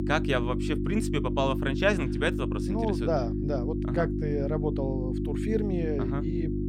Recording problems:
electrical hum; loud; throughout; 50 Hz, 5 dB below the speech

